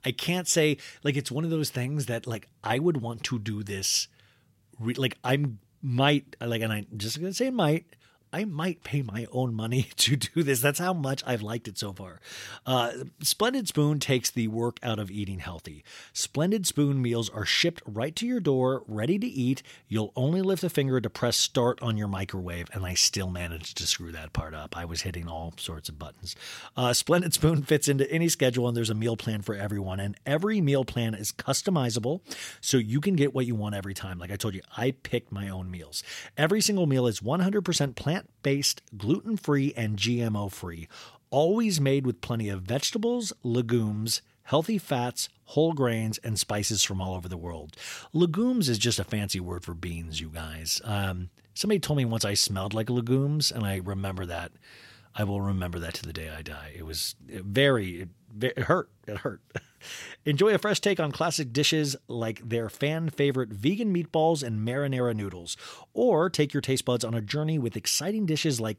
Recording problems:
none

